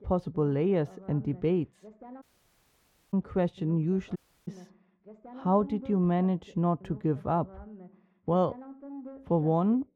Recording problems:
muffled; very; fading above 3.5 kHz
voice in the background; faint; throughout; 20 dB below the speech
audio cutting out; at 2 s for 1 s and at 4 s

